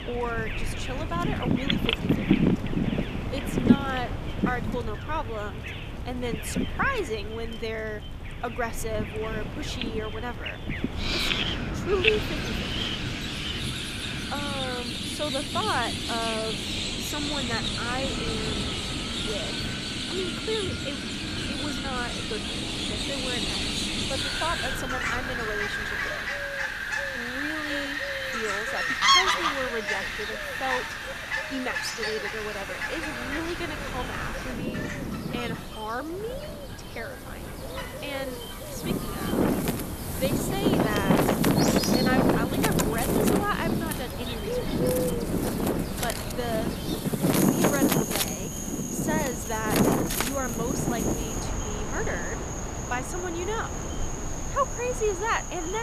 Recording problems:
echo of what is said; faint; throughout; 120 ms later, 20 dB below the speech
animal sounds; very loud; throughout; 2 dB above the speech
wind in the background; very loud; throughout; 3 dB above the speech
abrupt cut into speech; at the end

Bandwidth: 14.5 kHz